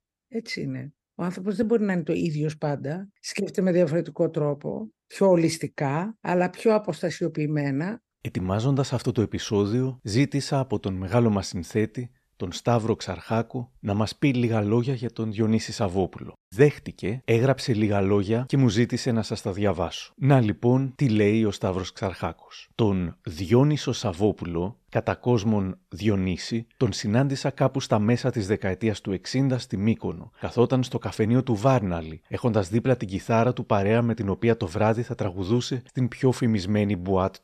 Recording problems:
none

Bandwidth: 13.5 kHz